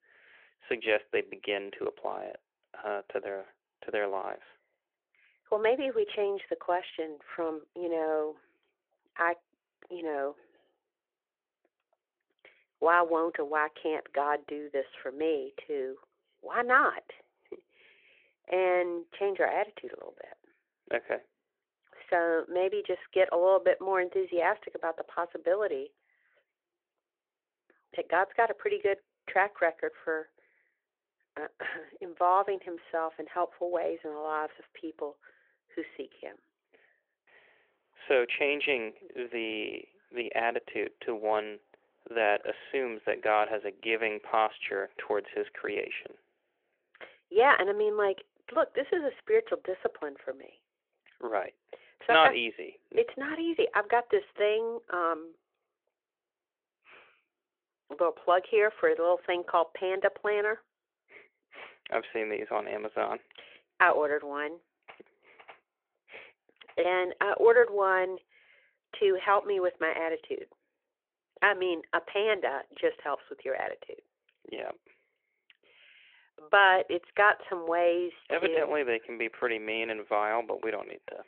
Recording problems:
phone-call audio; nothing above 3.5 kHz

